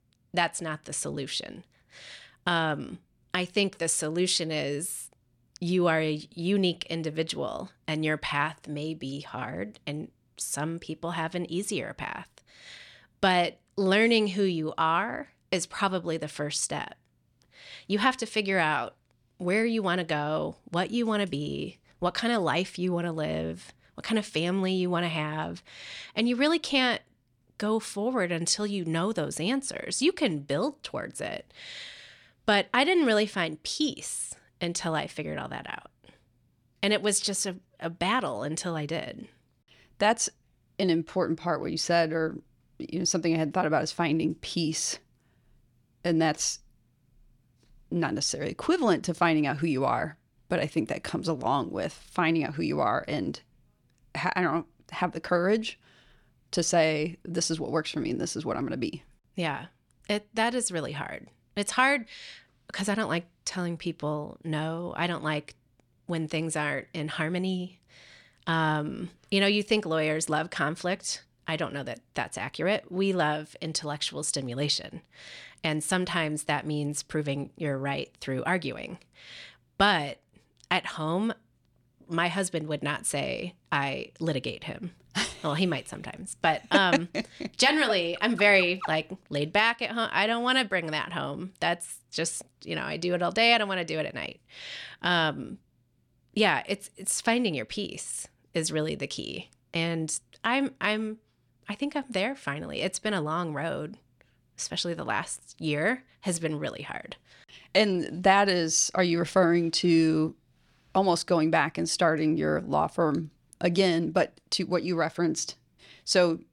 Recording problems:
none

